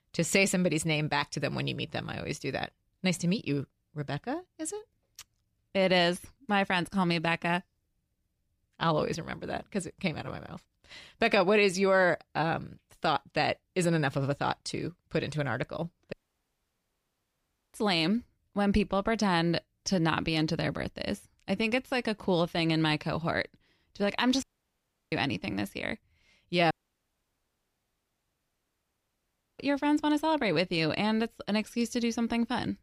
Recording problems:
audio cutting out; at 16 s for 1.5 s, at 24 s for 0.5 s and at 27 s for 3 s

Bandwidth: 15 kHz